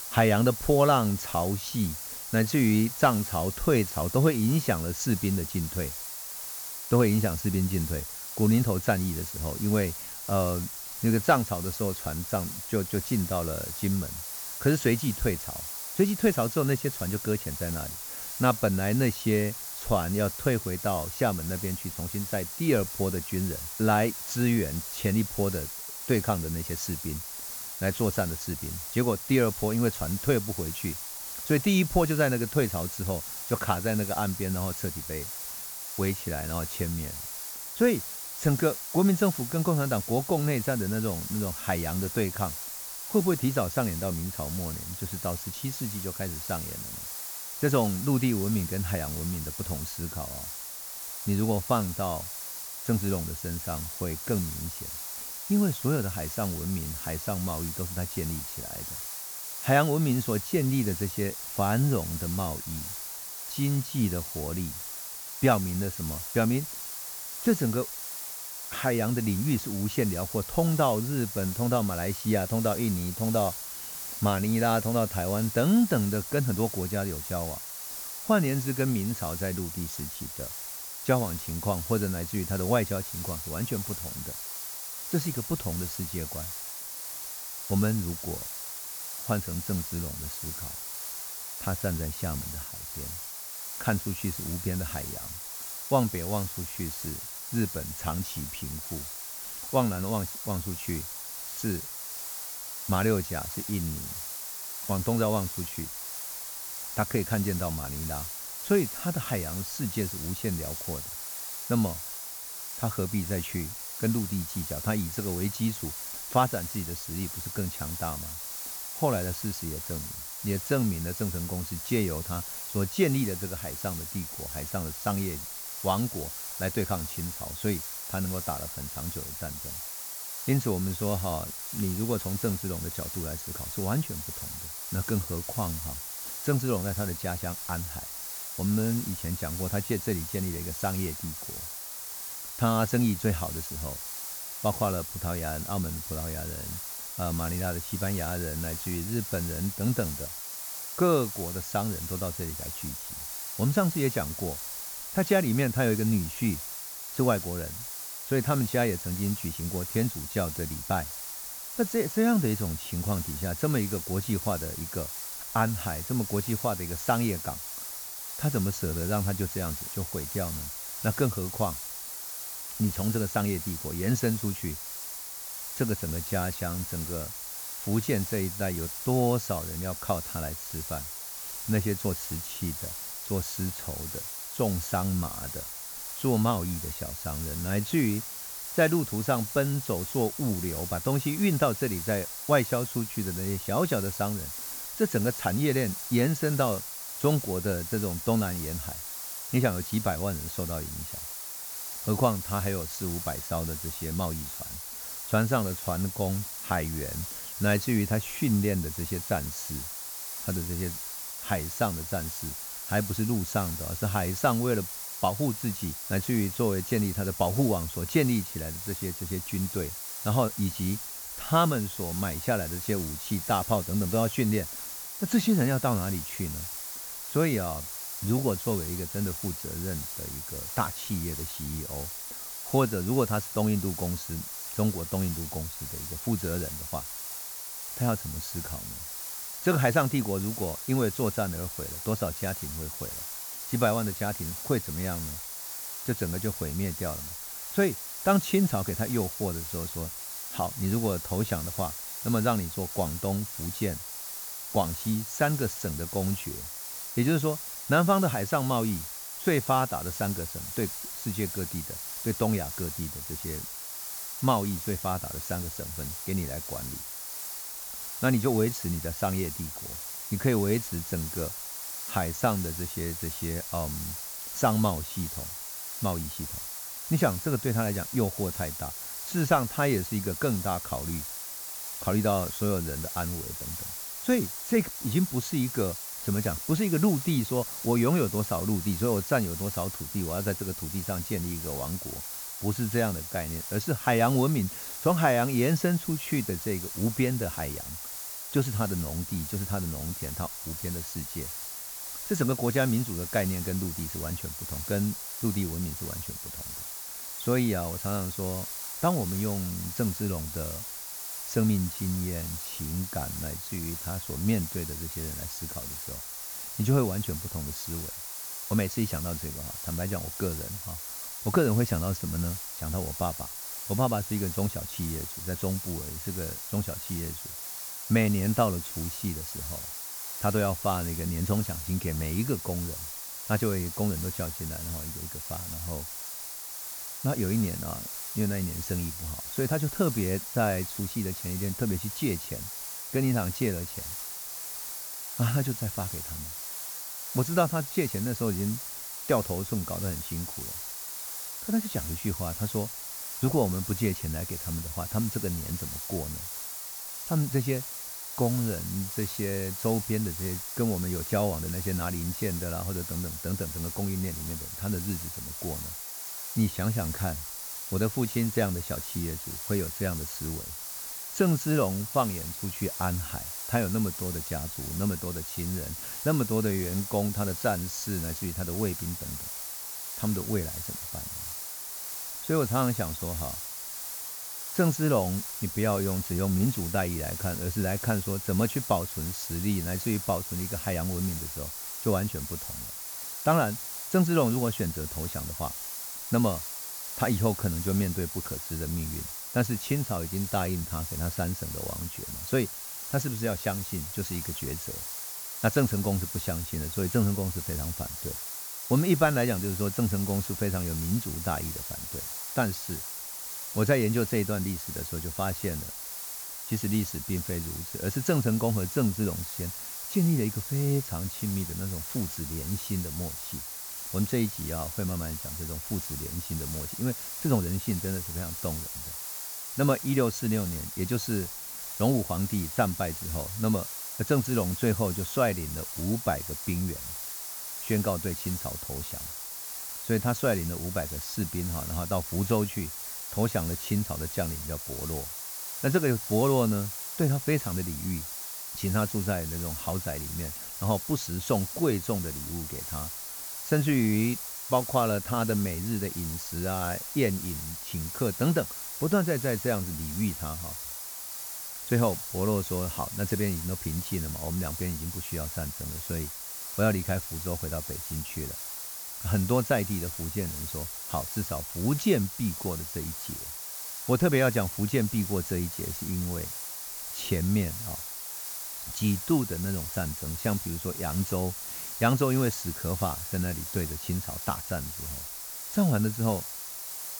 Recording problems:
high frequencies cut off; noticeable; nothing above 8 kHz
hiss; loud; throughout; 5 dB below the speech

